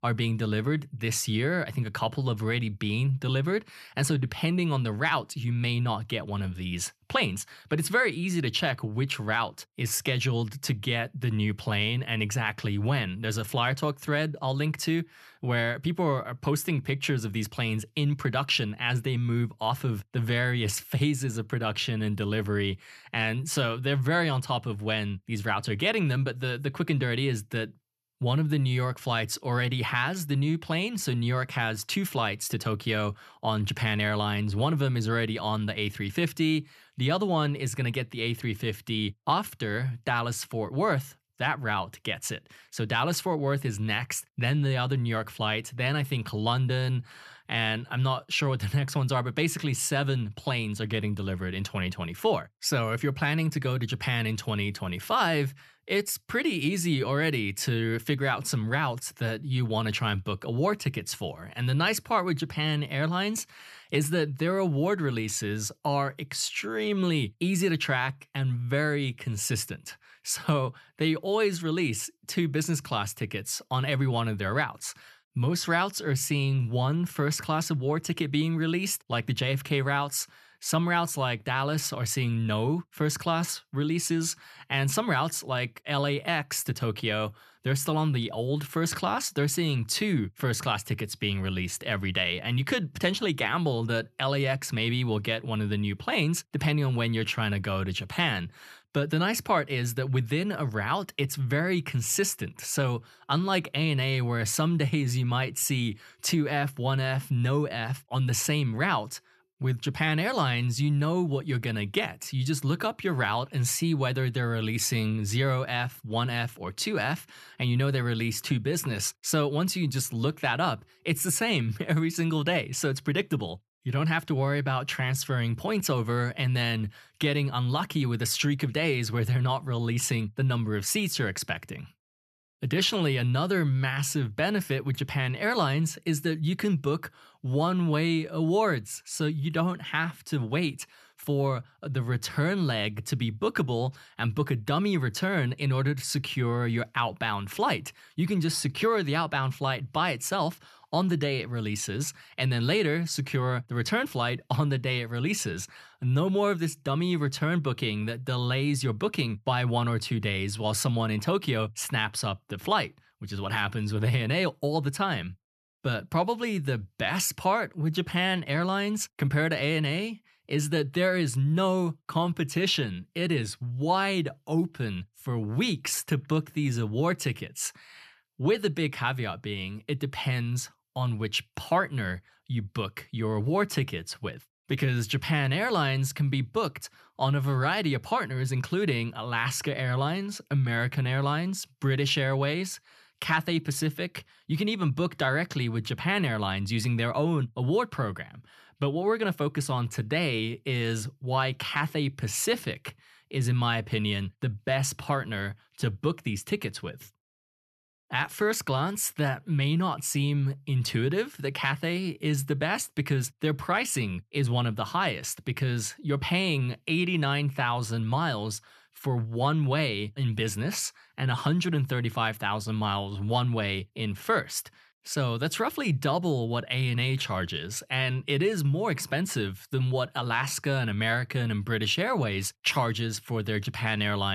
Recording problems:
abrupt cut into speech; at the end

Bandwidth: 13.5 kHz